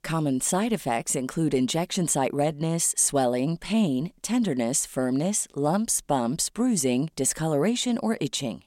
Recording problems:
none

